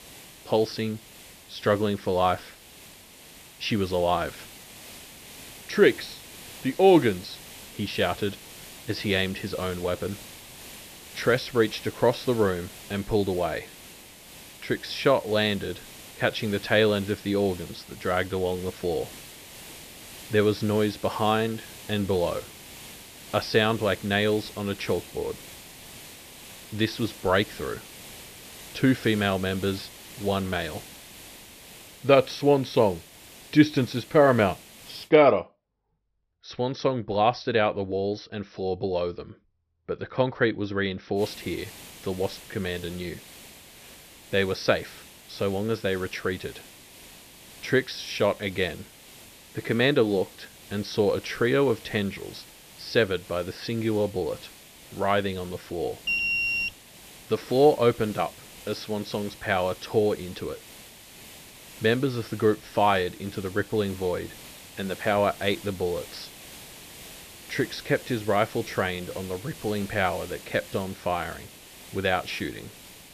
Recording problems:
high frequencies cut off; noticeable; nothing above 5.5 kHz
hiss; noticeable; until 35 s and from 41 s on; 15 dB below the speech
alarm; loud; at 56 s; peak 3 dB above the speech

